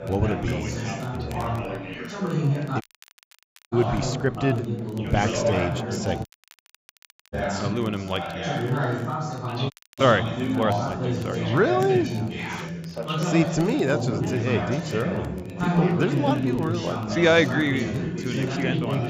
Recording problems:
high frequencies cut off; noticeable; nothing above 8 kHz
chatter from many people; loud; throughout; 2 dB below the speech
crowd noise; faint; throughout; 30 dB below the speech
crackle, like an old record; faint; 25 dB below the speech
audio cutting out; at 3 s for 1 s, at 6.5 s for 1 s and at 9.5 s

